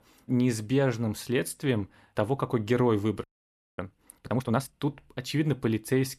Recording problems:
audio freezing; at 3 s for 0.5 s

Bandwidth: 14 kHz